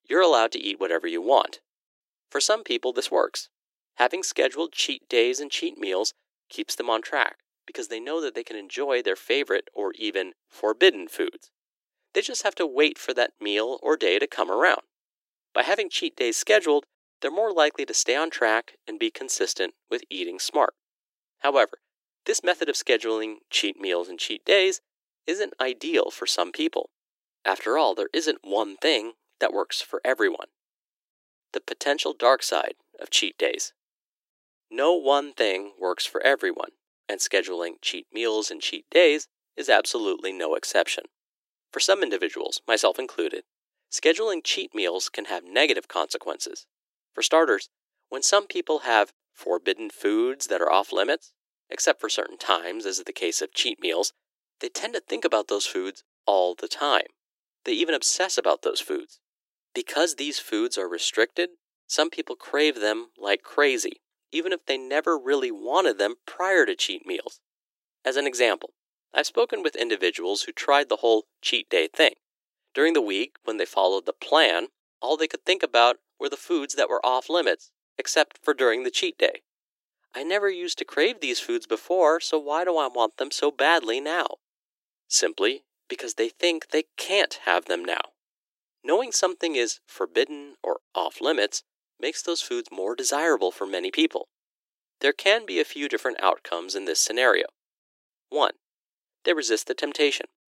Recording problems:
thin; very; fading below 300 Hz

